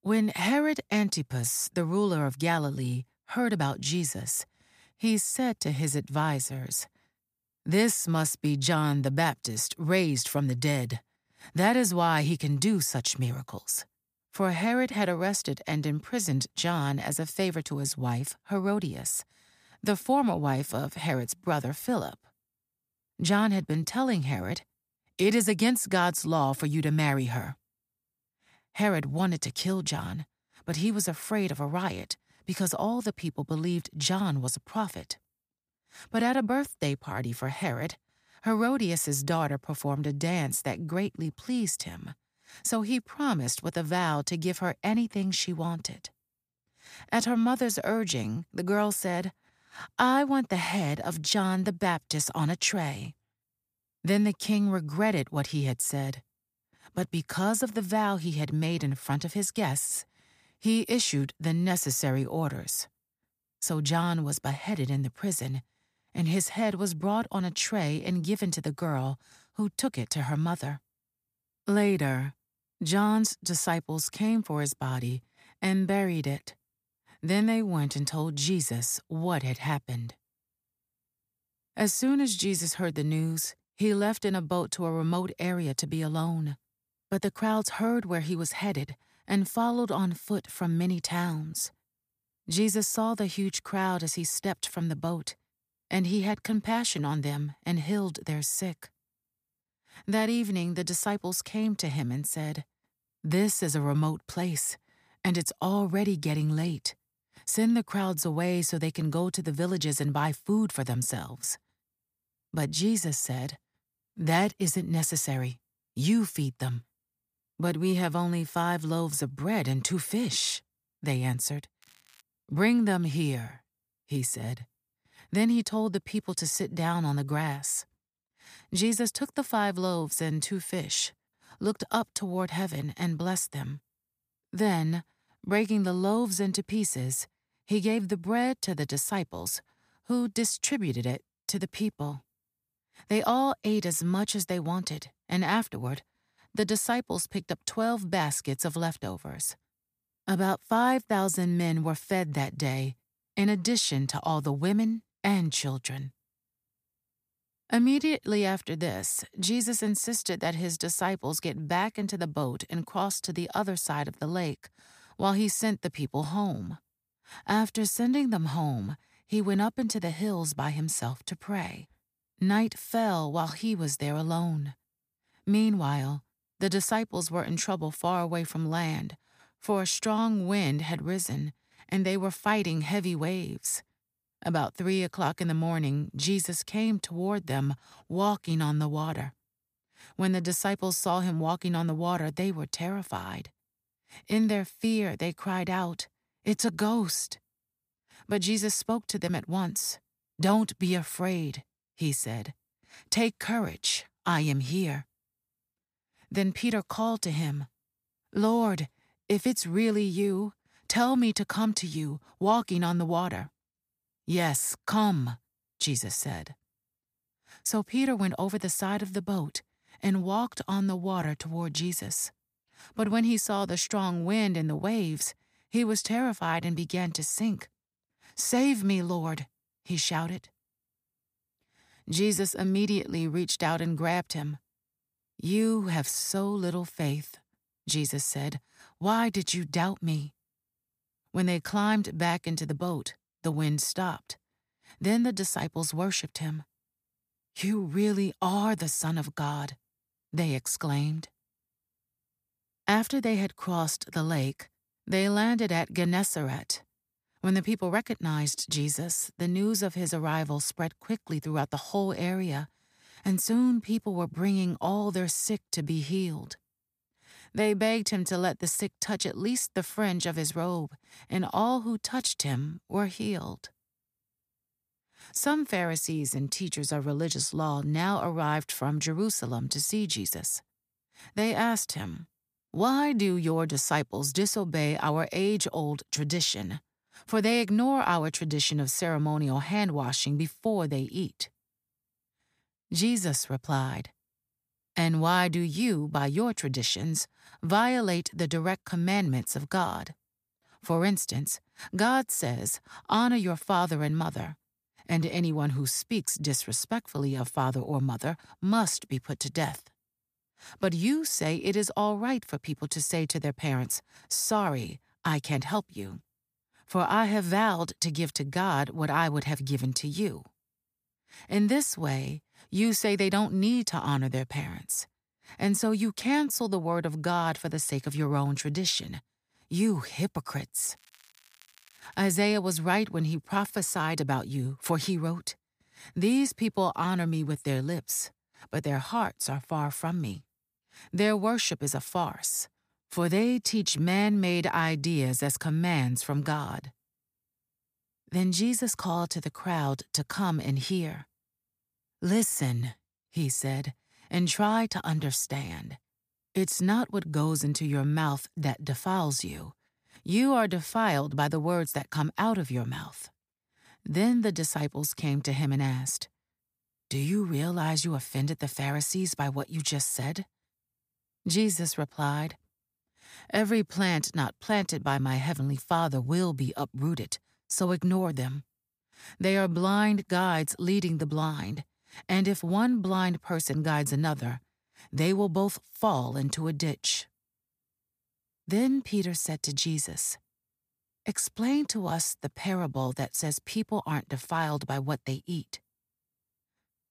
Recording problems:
crackling; faint; at 2:02 and from 5:31 to 5:32, mostly in the pauses; 30 dB below the speech

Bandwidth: 15 kHz